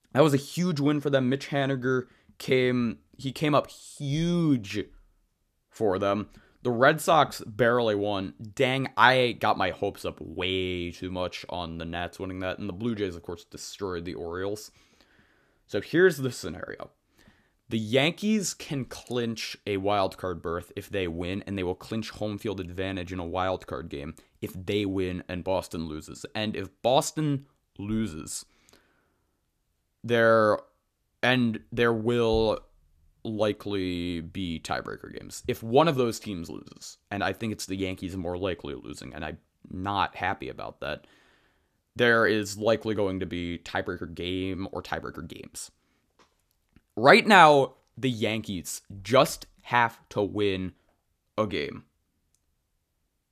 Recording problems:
none

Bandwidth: 14.5 kHz